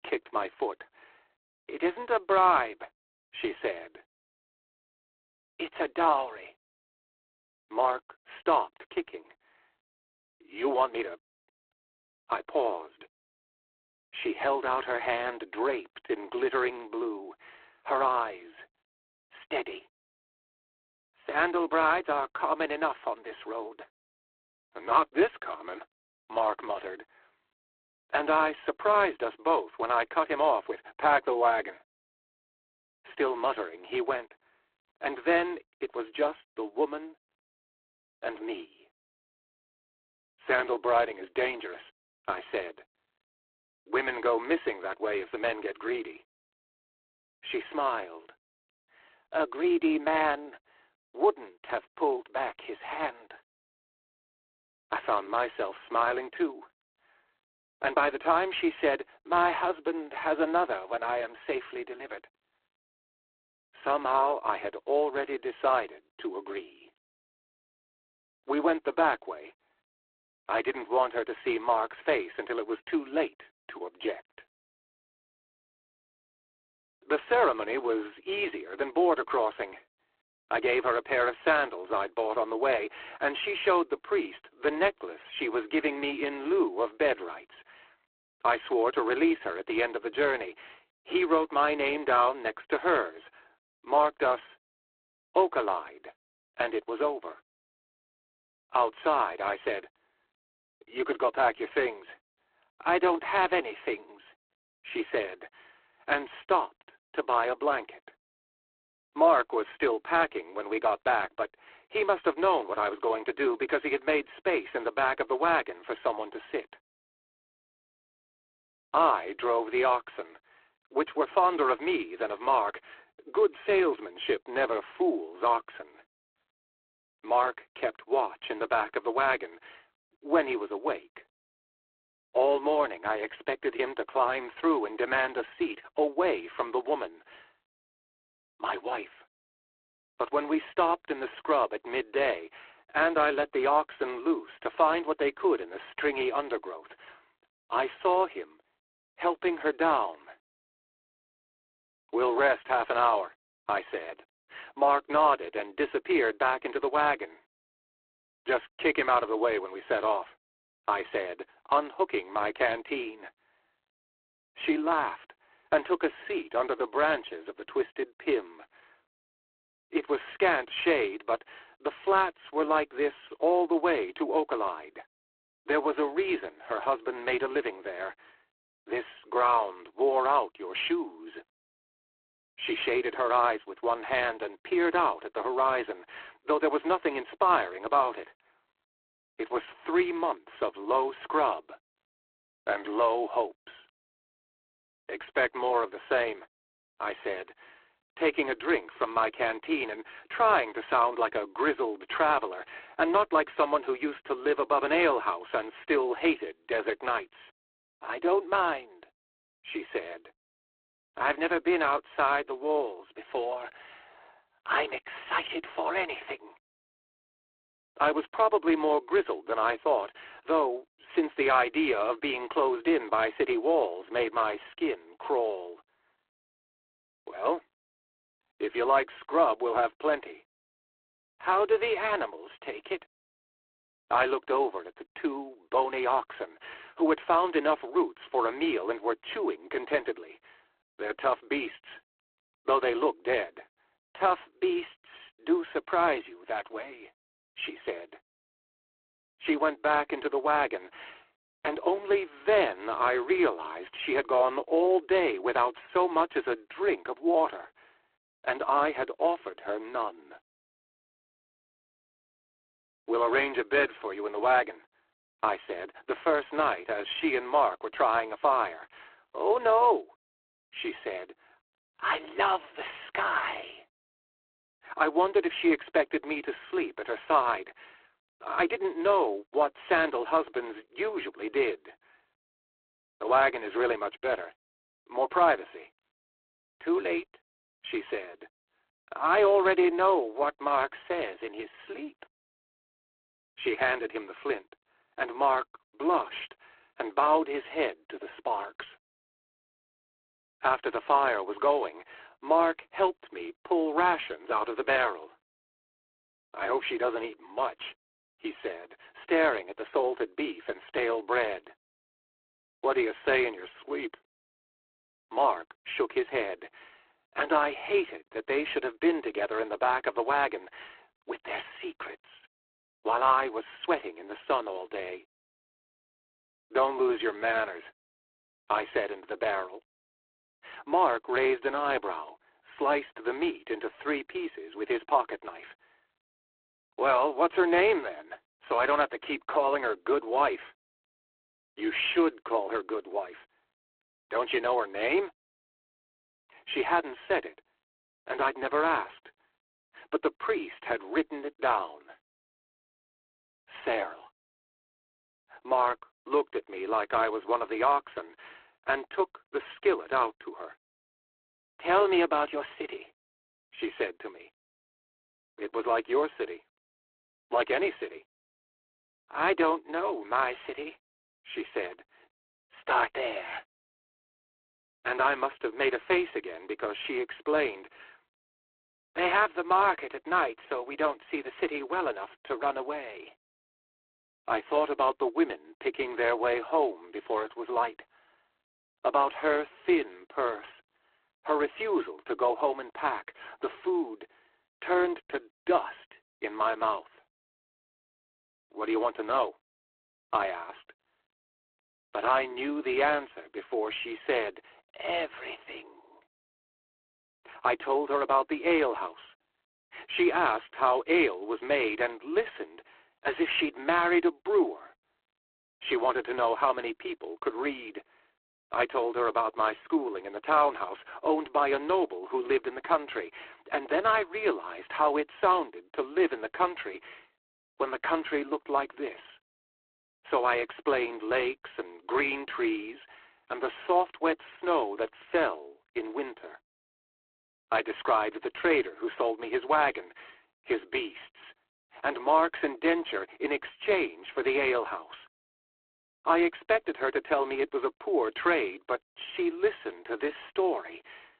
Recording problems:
phone-call audio; poor line; nothing above 3.5 kHz

